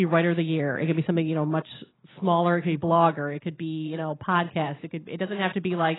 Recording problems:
garbled, watery; badly; nothing above 4 kHz
abrupt cut into speech; at the start

